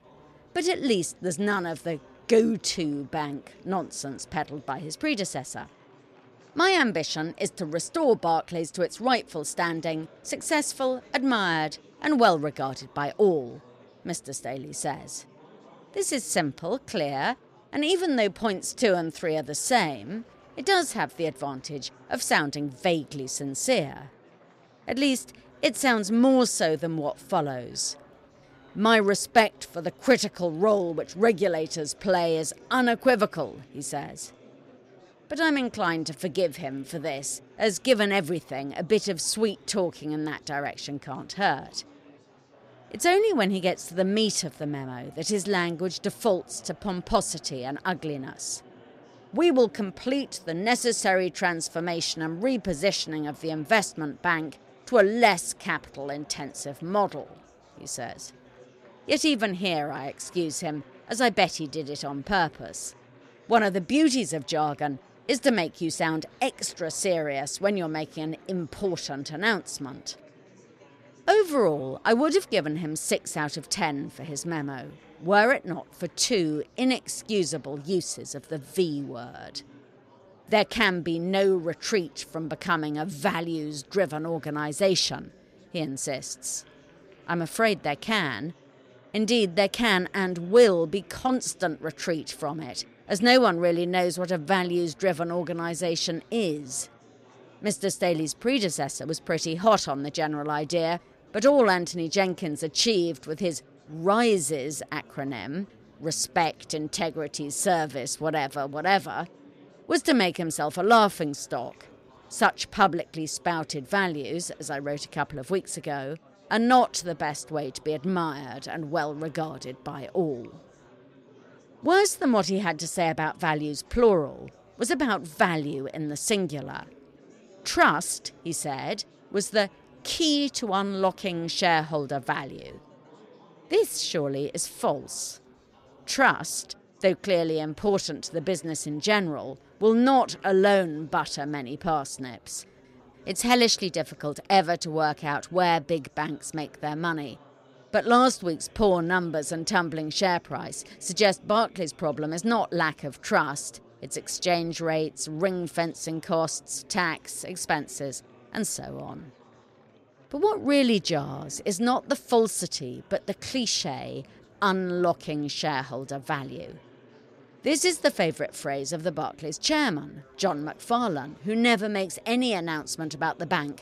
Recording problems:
murmuring crowd; faint; throughout; 30 dB below the speech

